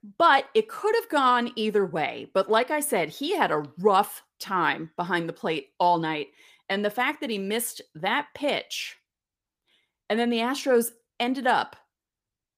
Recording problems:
none

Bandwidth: 15 kHz